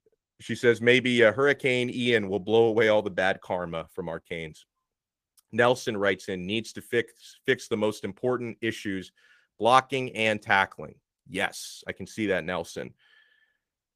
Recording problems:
garbled, watery; slightly; nothing above 15 kHz

